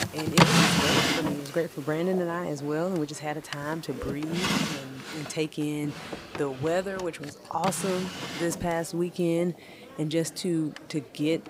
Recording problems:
household noises; very loud; throughout; 4 dB above the speech
murmuring crowd; noticeable; throughout; 20 dB below the speech

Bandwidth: 15.5 kHz